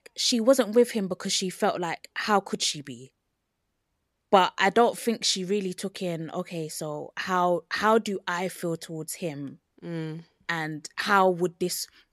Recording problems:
none

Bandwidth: 14.5 kHz